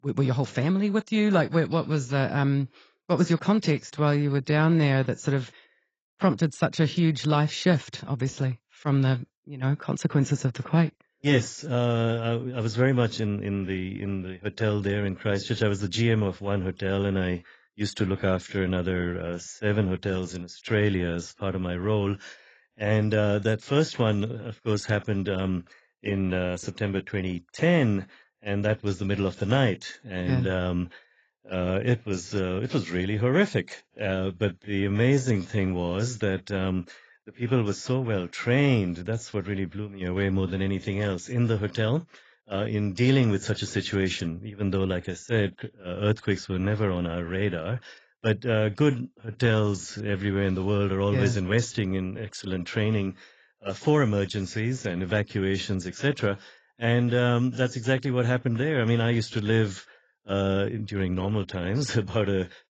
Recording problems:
garbled, watery; badly; nothing above 7.5 kHz
uneven, jittery; strongly; from 4 to 50 s

